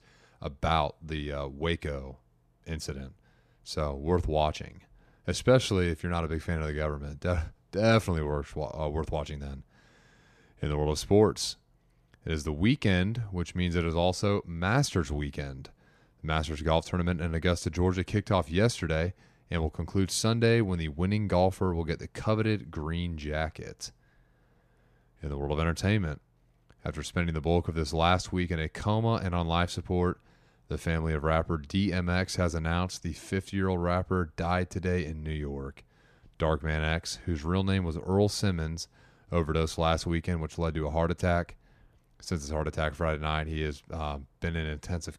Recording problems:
none

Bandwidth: 14.5 kHz